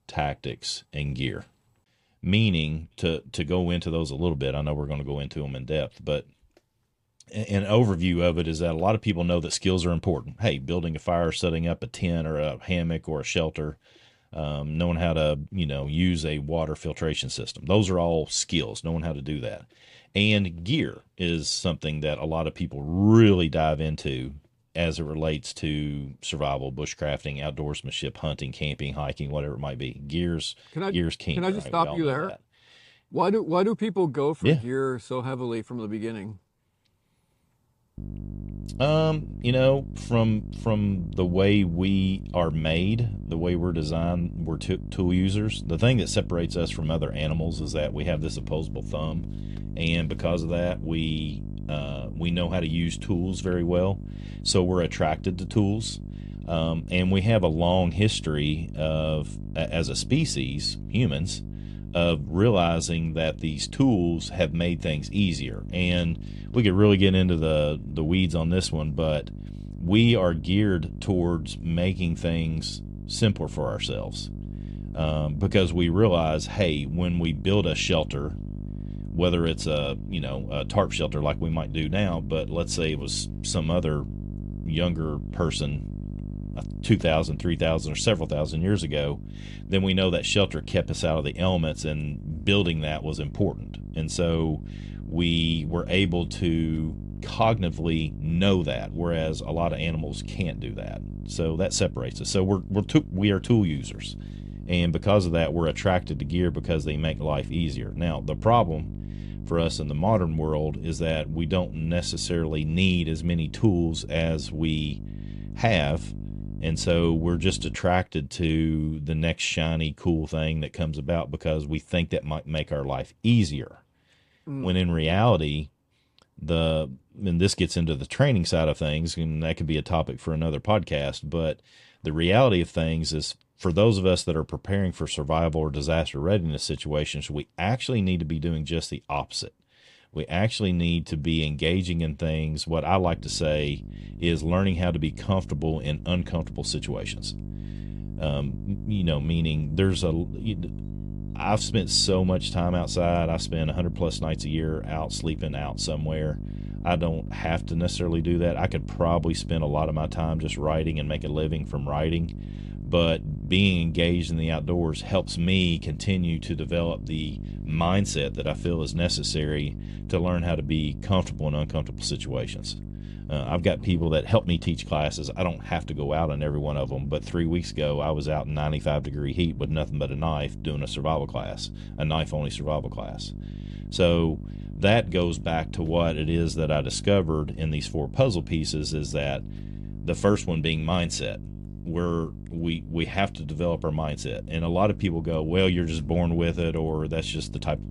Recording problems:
electrical hum; noticeable; from 38 s to 1:58 and from 2:23 on; 50 Hz, 20 dB below the speech

